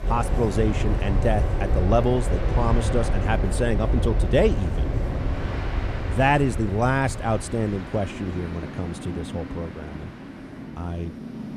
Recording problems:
train or aircraft noise; loud; throughout; 3 dB below the speech

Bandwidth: 14.5 kHz